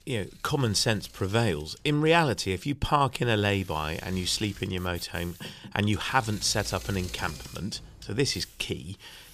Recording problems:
machinery noise; noticeable; throughout; 20 dB below the speech

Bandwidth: 14.5 kHz